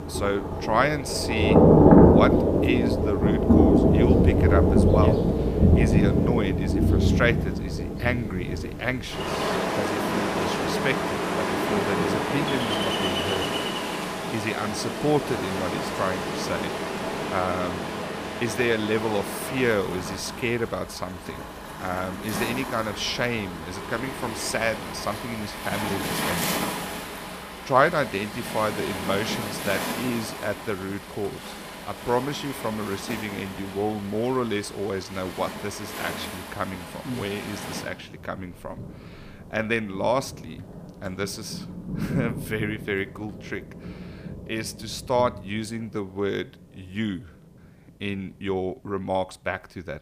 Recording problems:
rain or running water; very loud; throughout; 4 dB above the speech

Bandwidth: 15 kHz